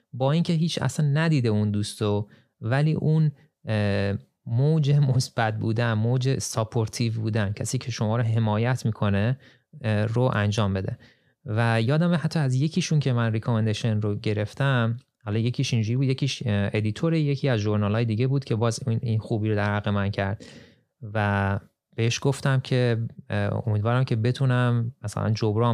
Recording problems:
abrupt cut into speech; at the end

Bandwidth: 15 kHz